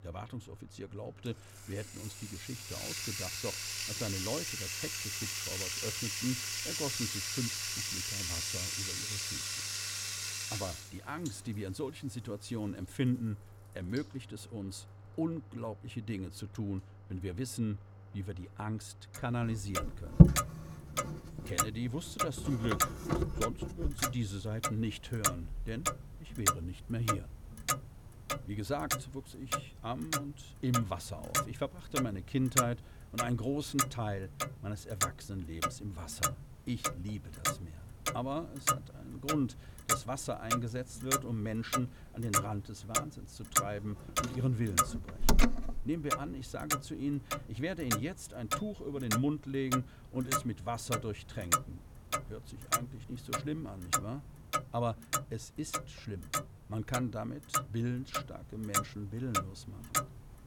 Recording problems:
household noises; very loud; throughout; 5 dB above the speech

